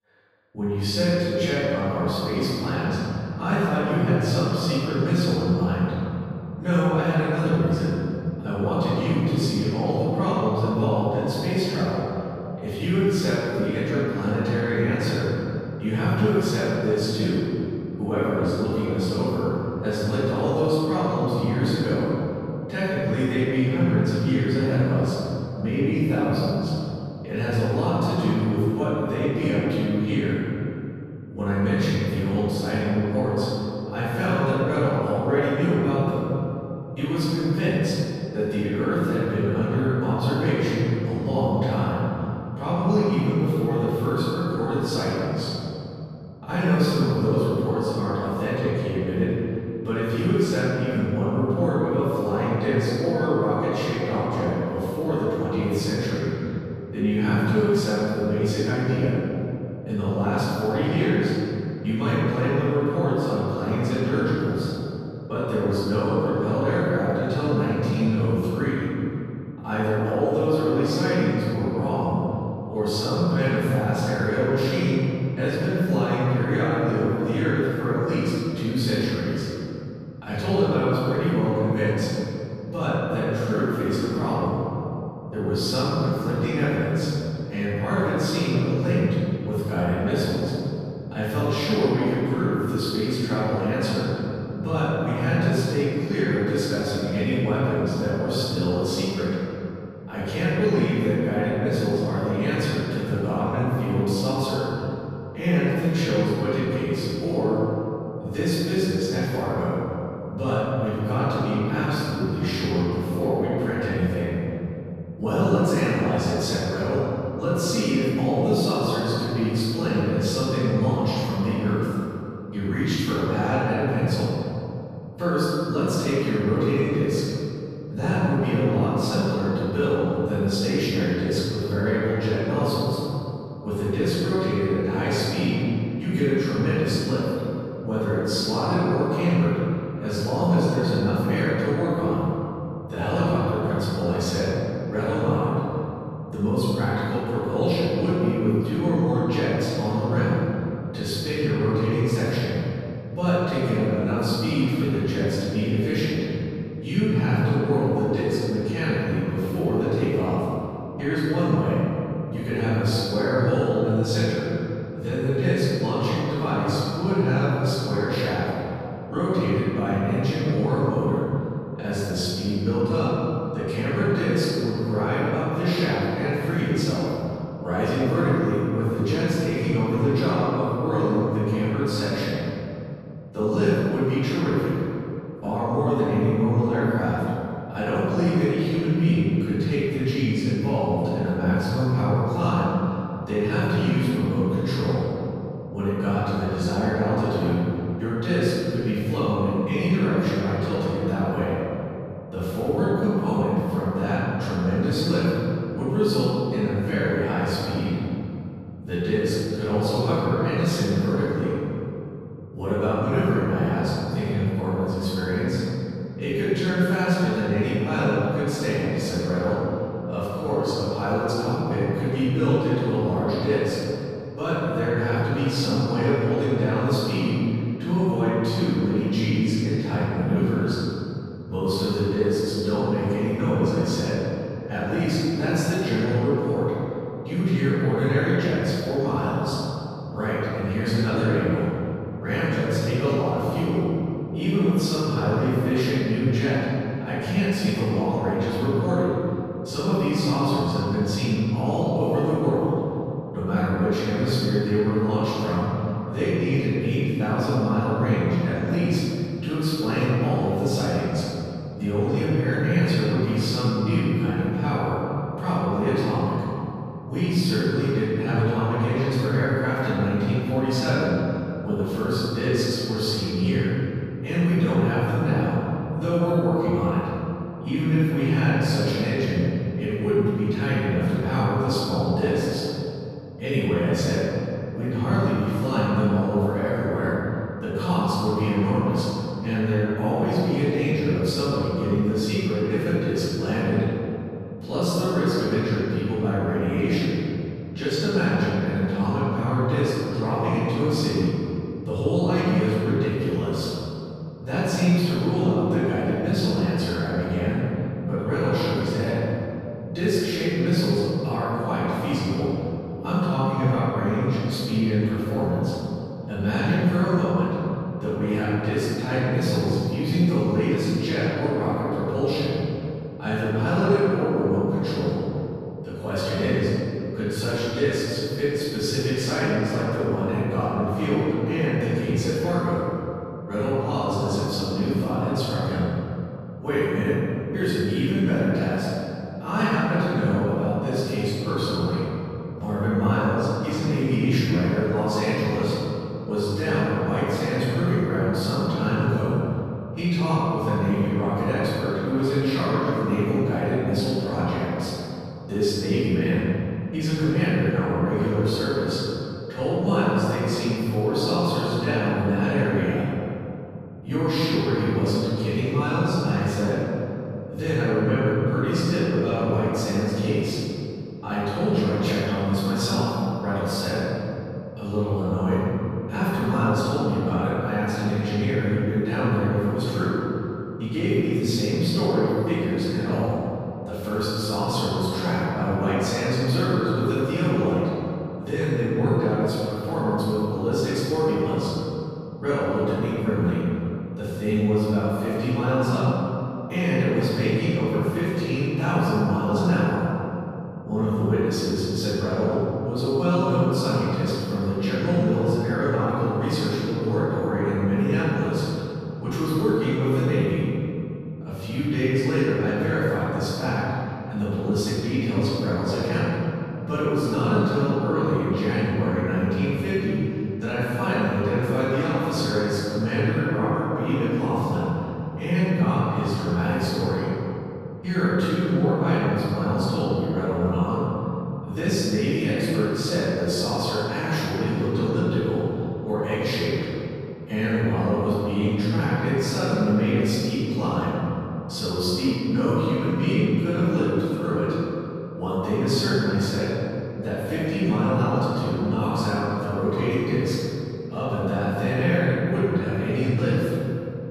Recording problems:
room echo; strong; dies away in 2.8 s
off-mic speech; far

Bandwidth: 14.5 kHz